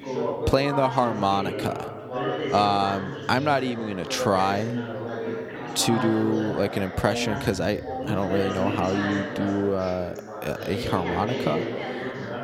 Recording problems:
background chatter; loud; throughout; 4 voices, 5 dB below the speech

